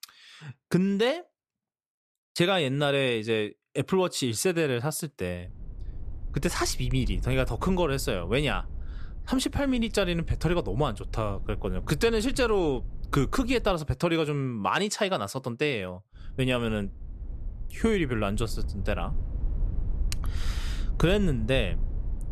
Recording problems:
low rumble; faint; from 5.5 to 14 s and from 16 s on; 25 dB below the speech

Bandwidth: 14 kHz